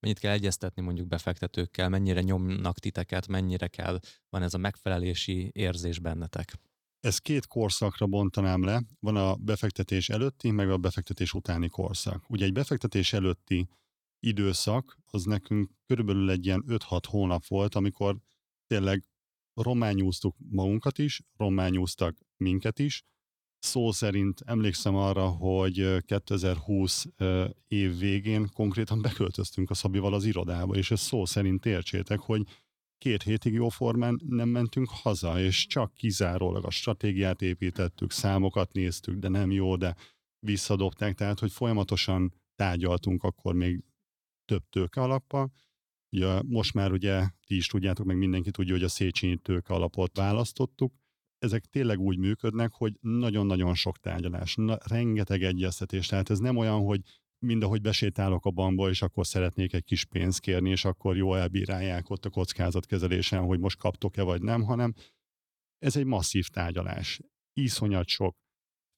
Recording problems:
none

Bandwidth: 18.5 kHz